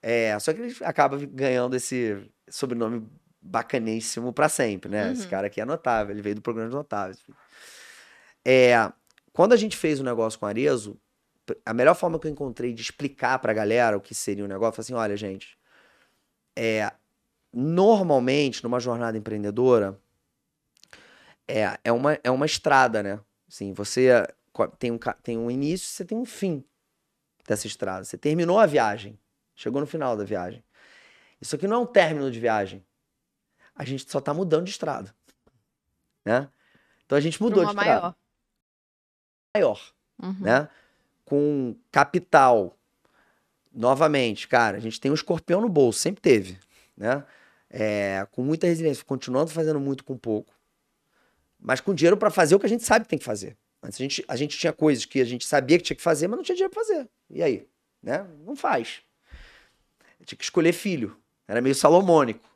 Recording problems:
audio cutting out; at 39 s for 1 s

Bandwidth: 14 kHz